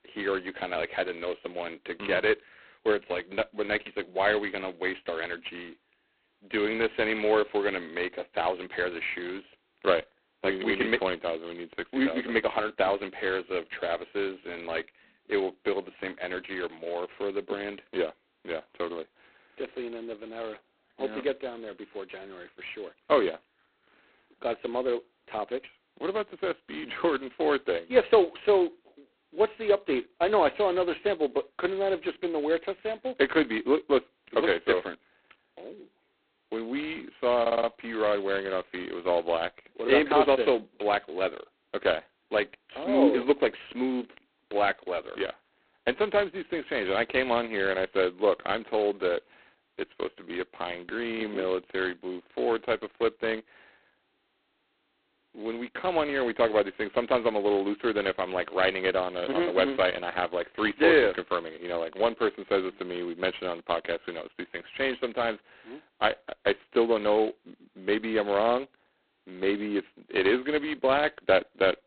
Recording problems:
phone-call audio; poor line; nothing above 4 kHz
audio stuttering; at 37 s

